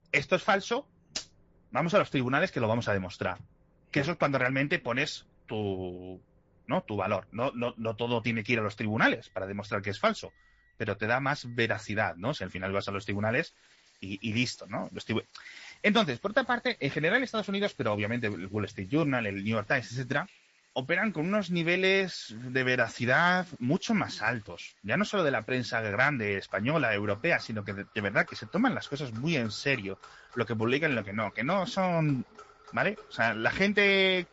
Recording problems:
high frequencies cut off; noticeable; nothing above 7.5 kHz
garbled, watery; slightly
household noises; faint; throughout; 25 dB below the speech

